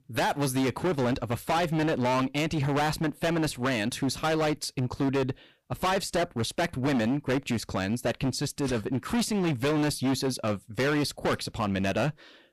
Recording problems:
distortion; heavy; 21% of the sound clipped

